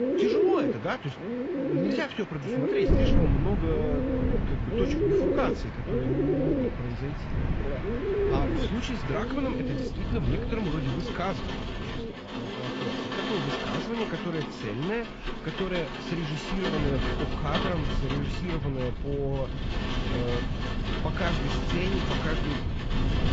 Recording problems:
garbled, watery; badly; nothing above 7.5 kHz
muffled; very slightly; fading above 4 kHz
animal sounds; very loud; throughout; 3 dB above the speech
wind noise on the microphone; heavy; from 3 to 12 s and from 17 s on; 8 dB below the speech
rain or running water; loud; throughout; 3 dB below the speech

